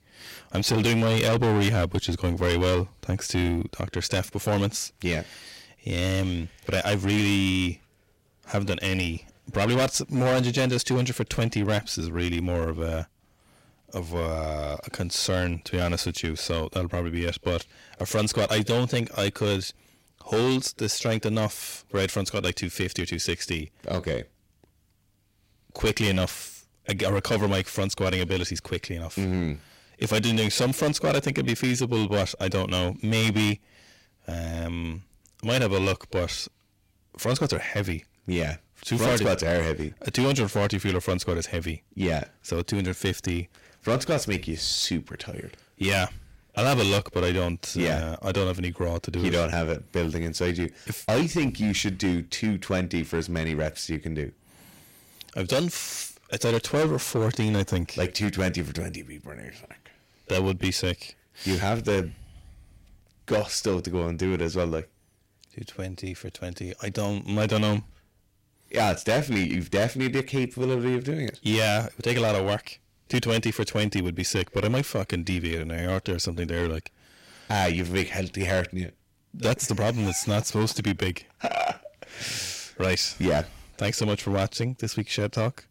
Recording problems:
distortion; heavy; 8% of the sound clipped

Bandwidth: 16 kHz